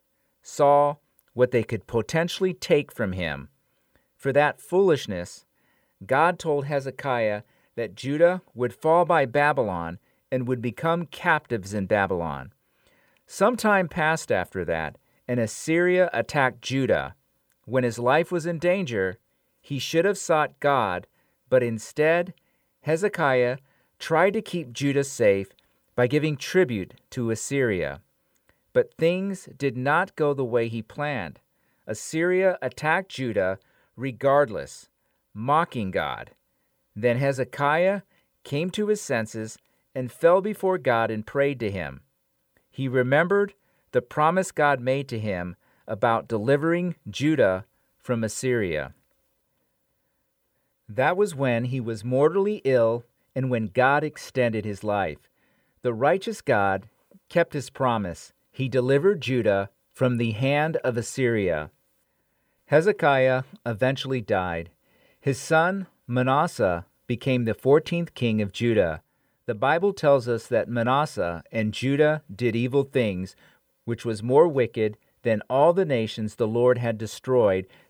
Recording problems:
none

